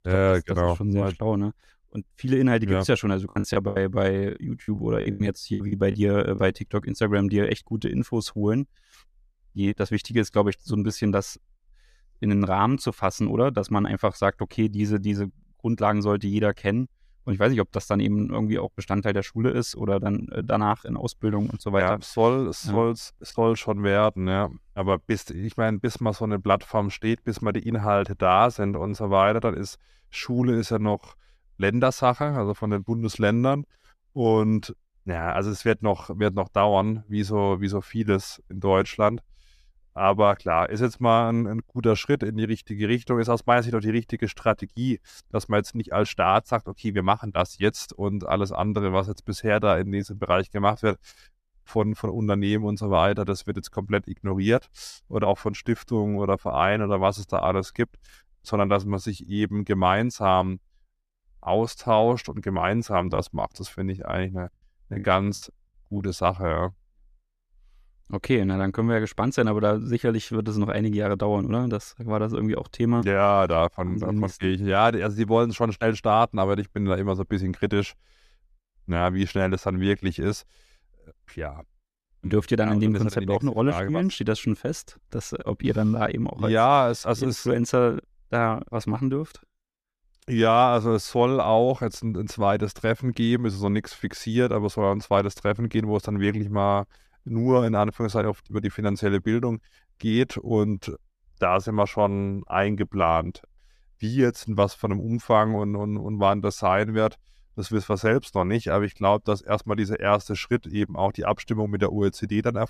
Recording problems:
choppy; very; from 3.5 to 6.5 s and from 1:03 to 1:06; 14% of the speech affected

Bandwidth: 14.5 kHz